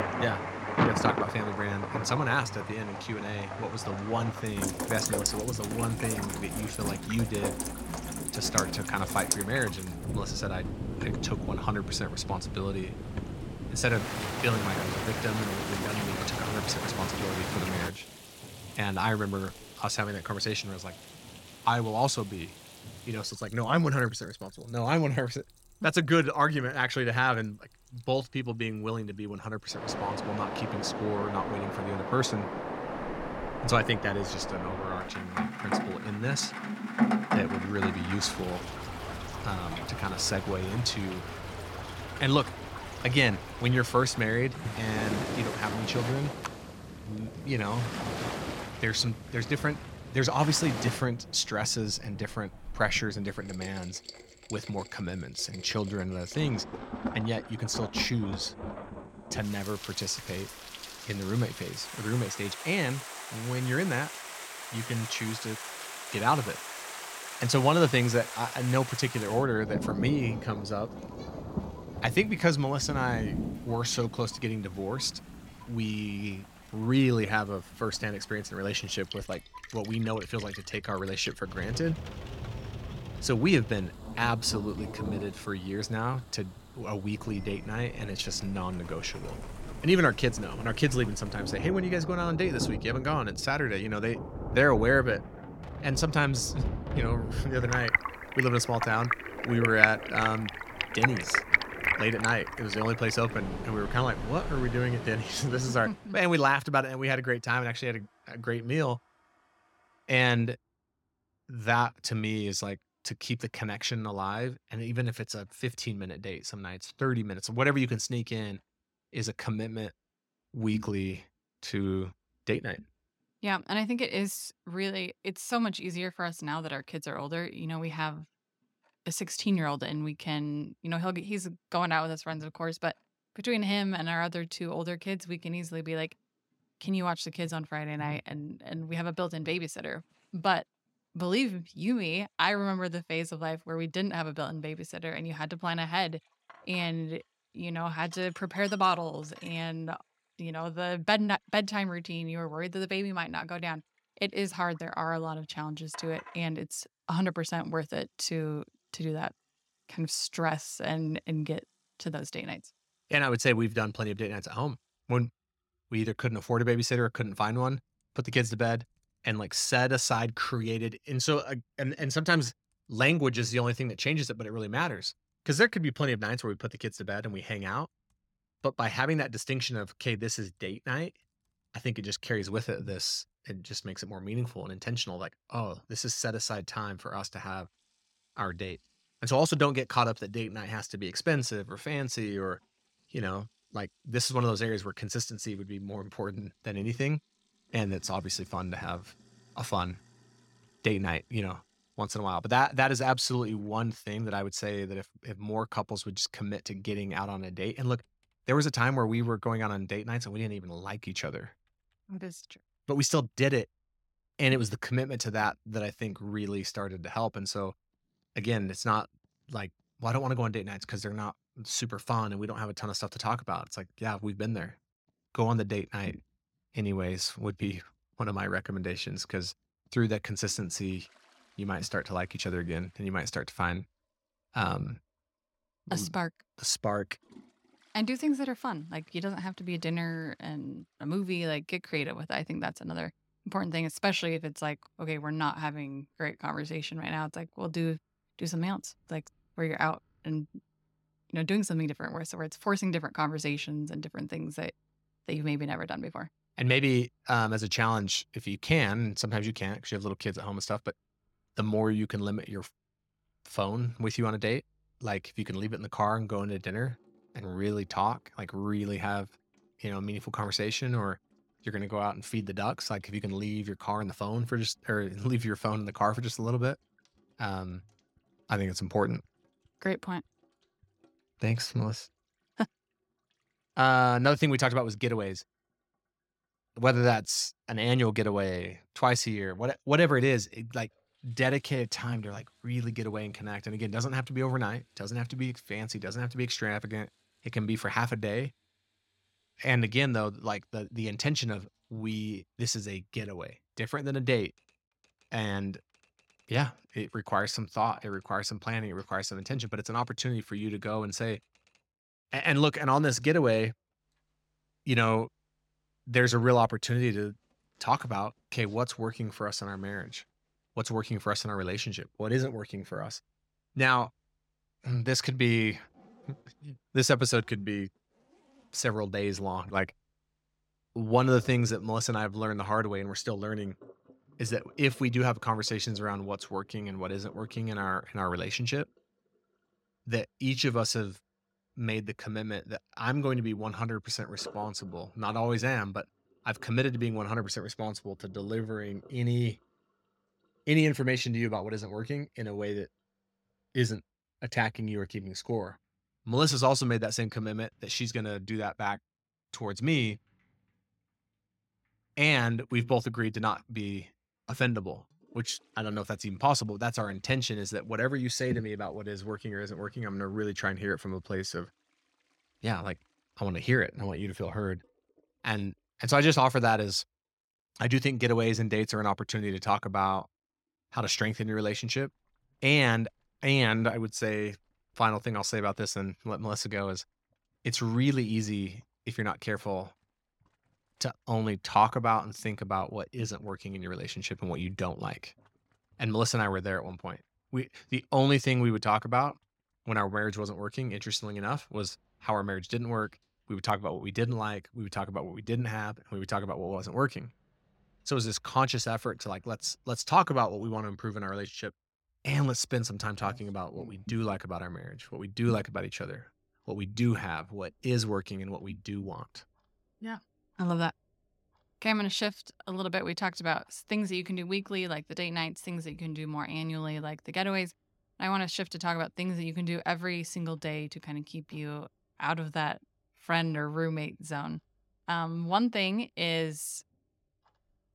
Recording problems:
rain or running water; loud; until 1:46; 4 dB below the speech
household noises; faint; throughout; 30 dB below the speech

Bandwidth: 16.5 kHz